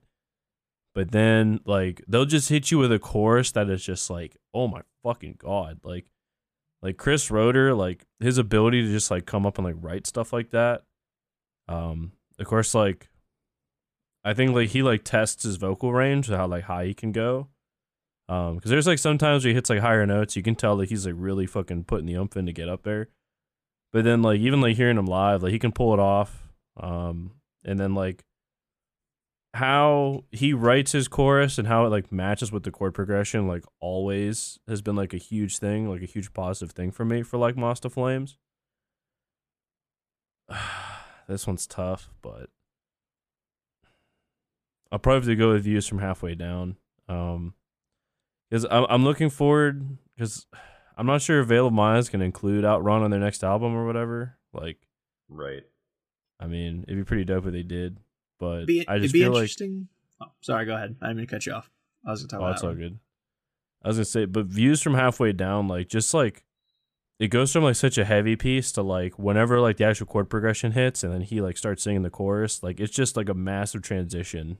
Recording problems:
none

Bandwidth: 14.5 kHz